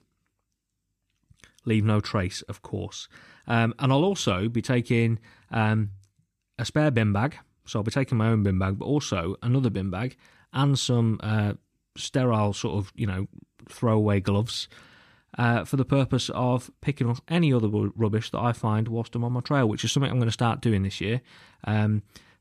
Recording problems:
none

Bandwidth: 14.5 kHz